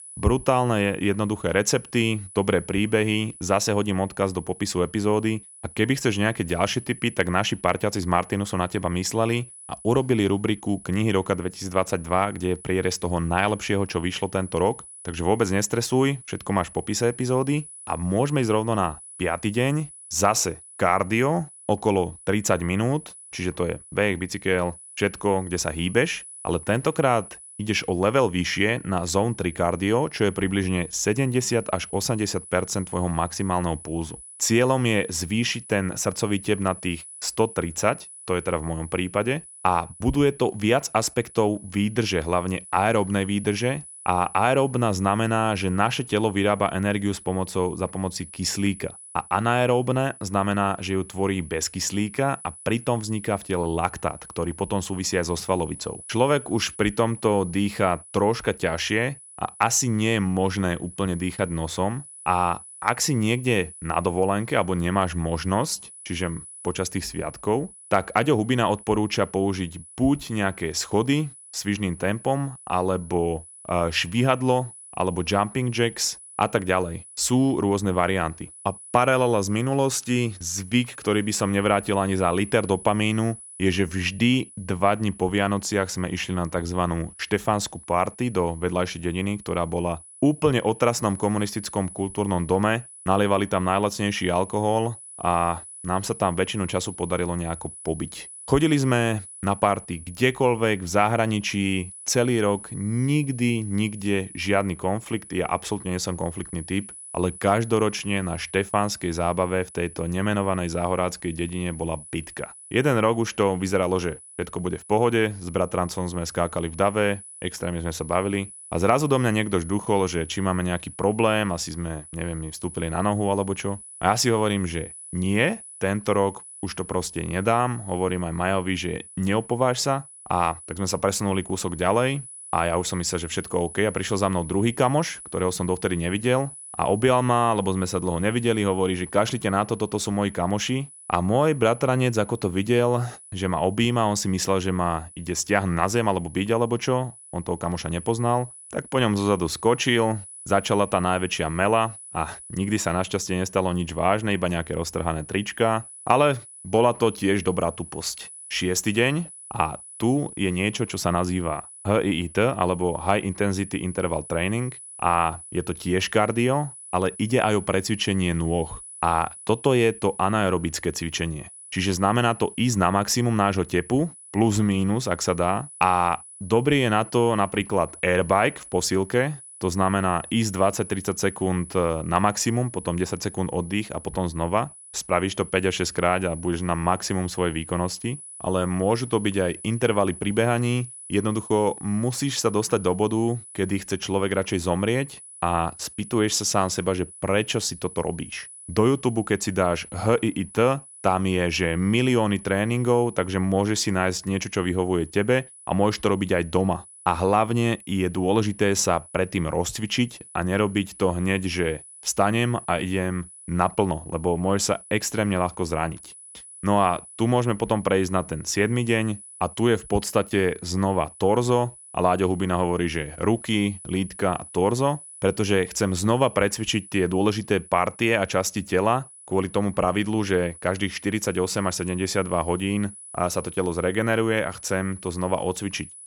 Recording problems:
high-pitched whine; noticeable; throughout; 10 kHz, 15 dB below the speech

